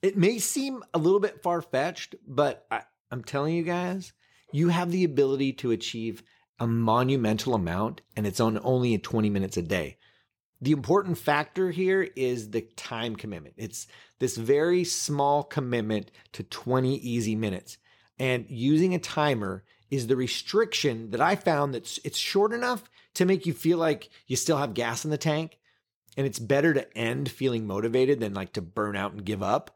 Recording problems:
none

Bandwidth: 18 kHz